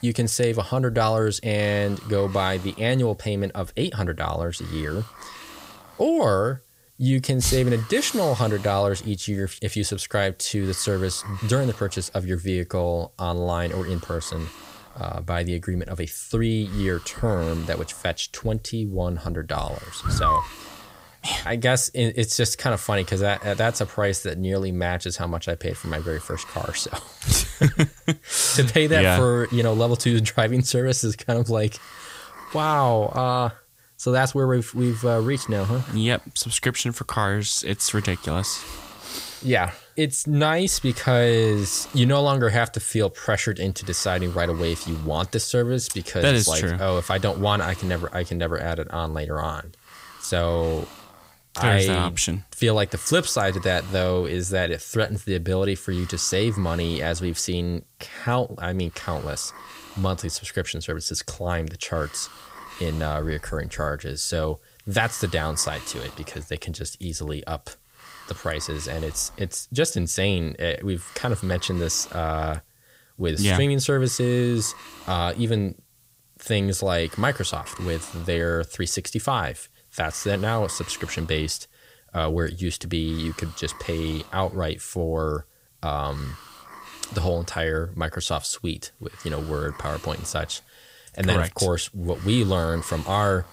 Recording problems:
hiss; noticeable; throughout; 20 dB below the speech

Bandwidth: 15.5 kHz